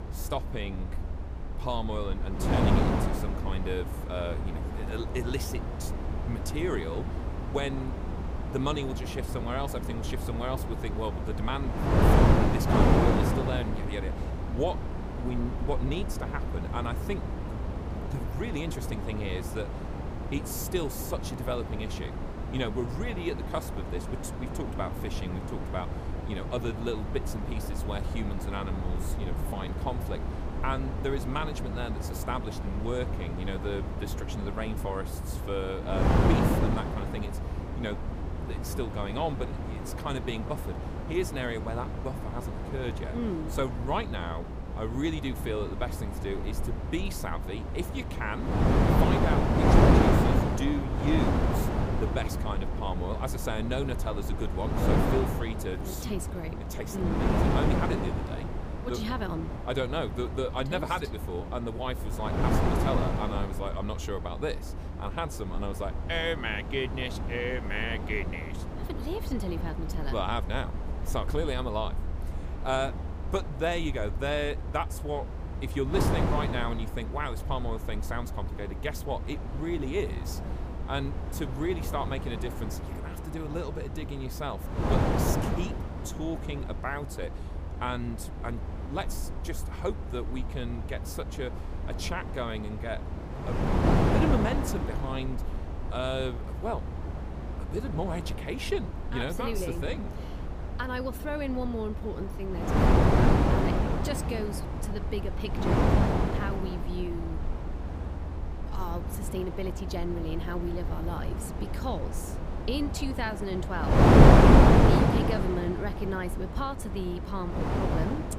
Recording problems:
wind noise on the microphone; heavy; 1 dB above the speech
low rumble; faint; throughout; 25 dB below the speech

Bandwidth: 15 kHz